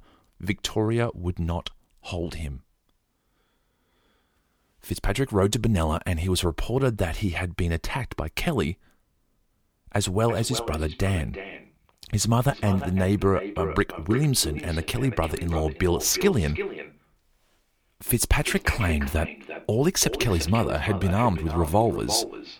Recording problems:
echo of what is said; strong; from 10 s on; 340 ms later, 10 dB below the speech

